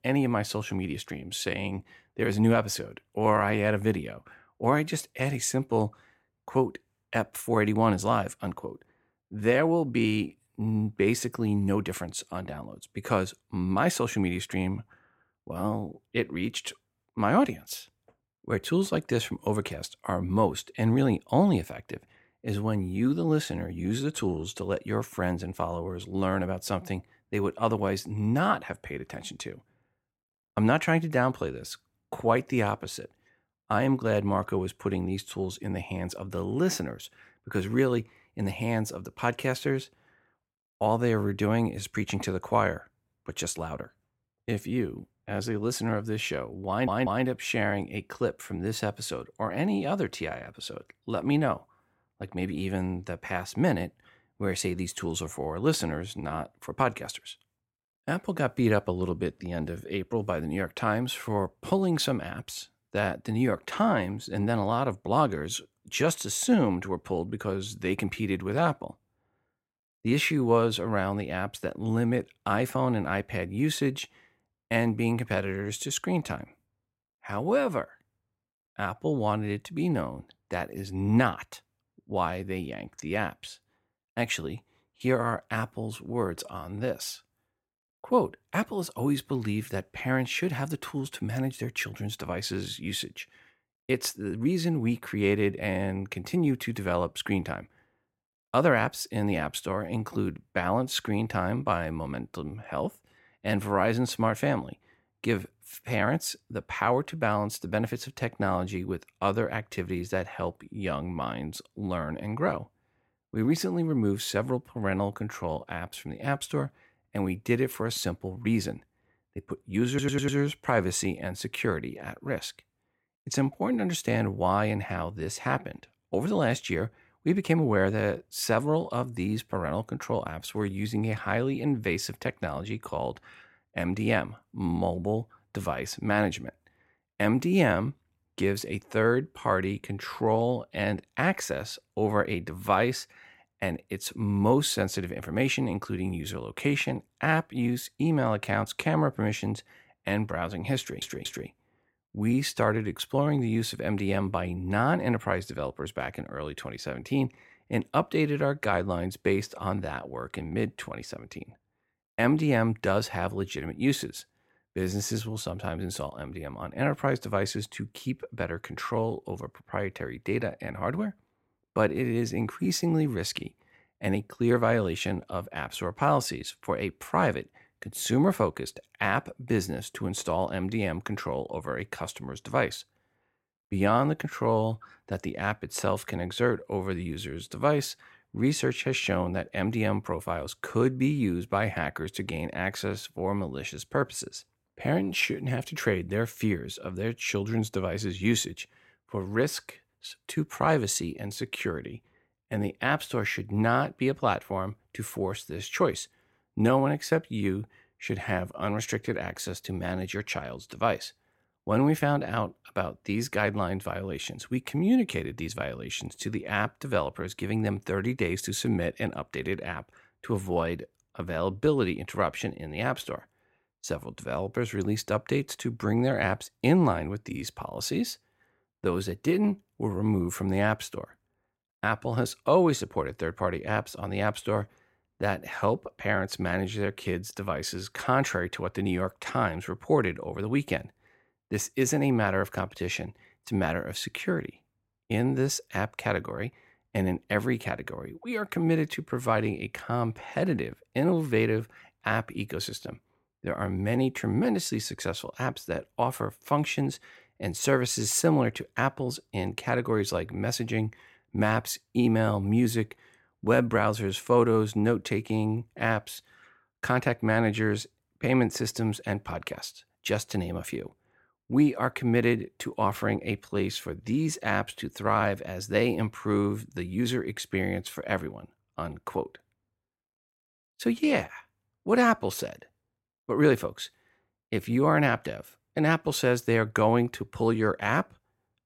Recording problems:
audio stuttering; at 47 s, at 2:00 and at 2:31

